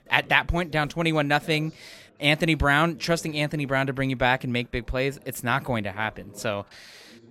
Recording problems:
background chatter; faint; throughout; 4 voices, 25 dB below the speech

